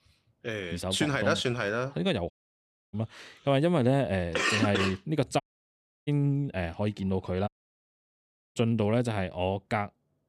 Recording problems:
audio cutting out; at 2.5 s for 0.5 s, at 5.5 s for 0.5 s and at 7.5 s for 1 s

